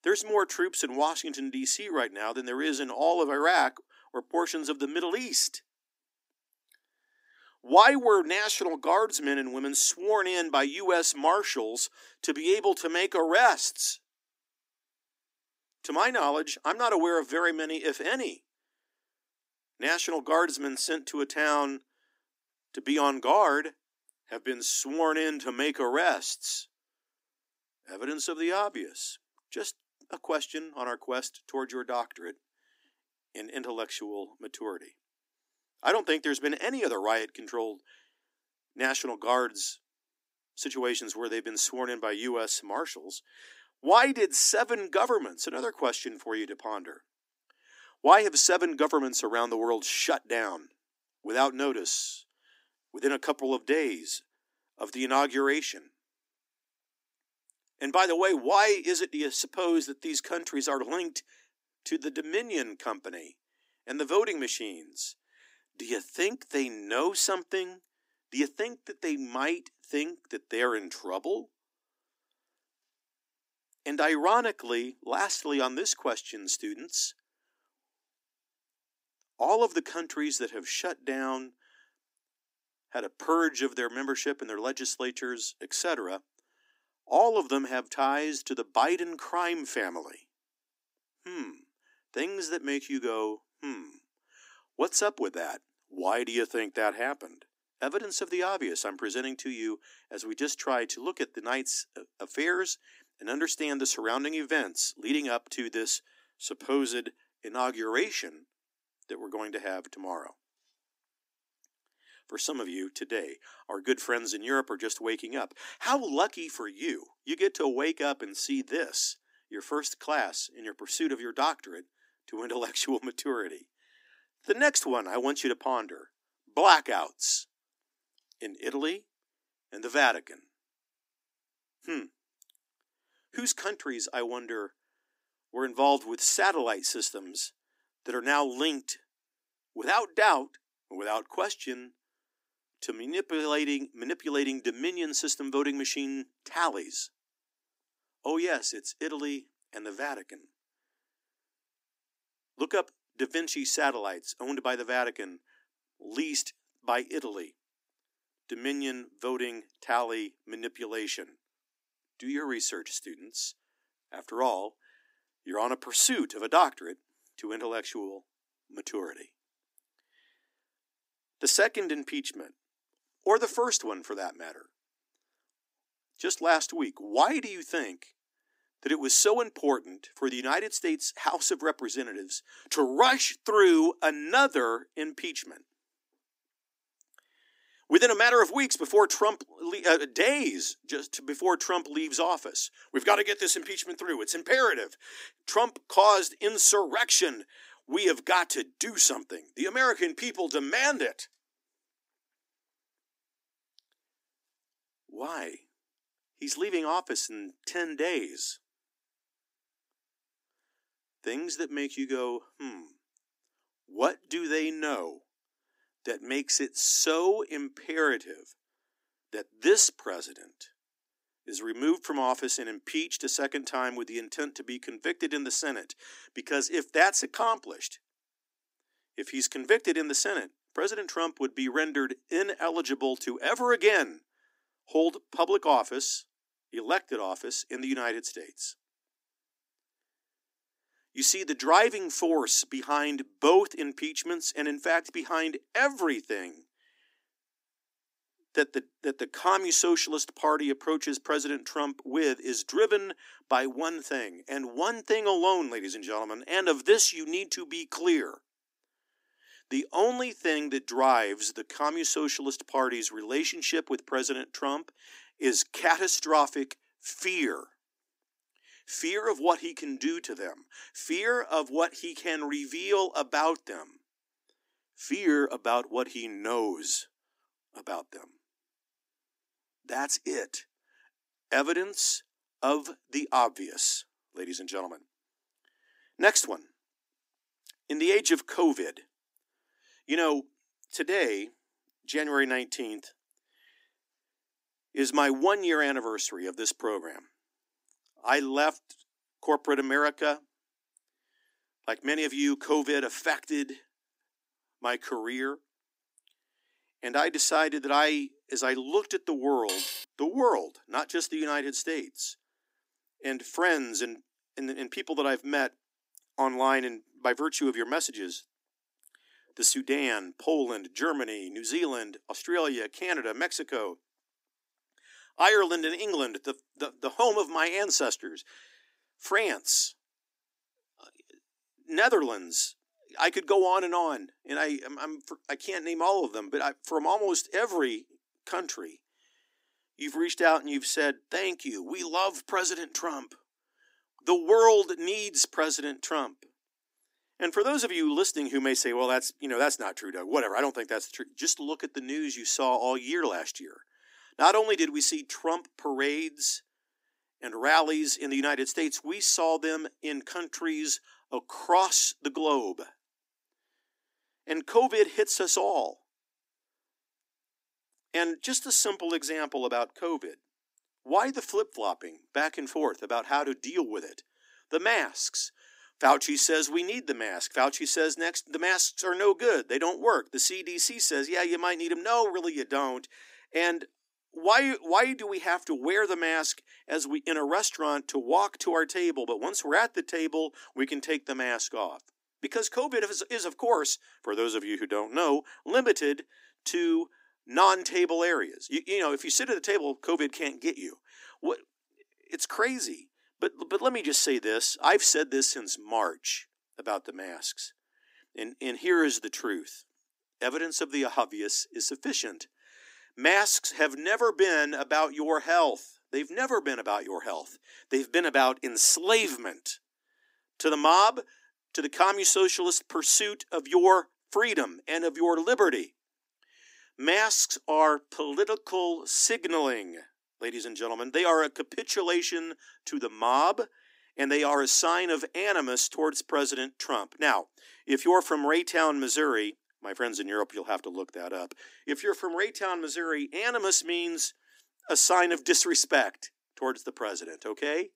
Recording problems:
thin; somewhat; fading below 250 Hz
clattering dishes; noticeable; at 5:10; peak 3 dB below the speech

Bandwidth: 15.5 kHz